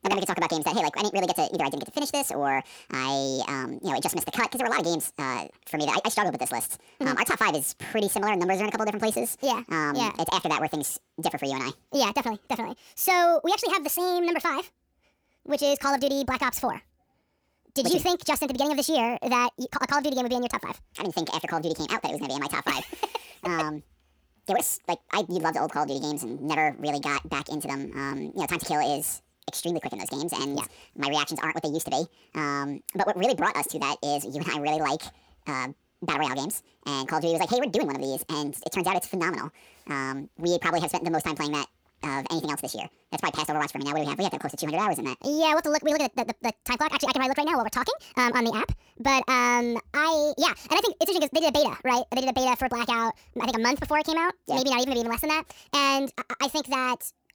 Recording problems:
wrong speed and pitch; too fast and too high; 1.7 times normal speed

